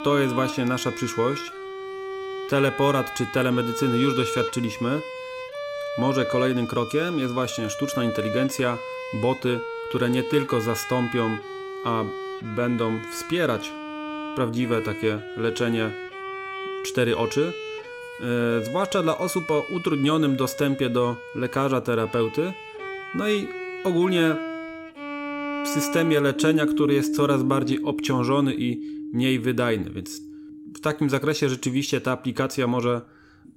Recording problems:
background music; loud; throughout; 7 dB below the speech

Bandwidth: 16 kHz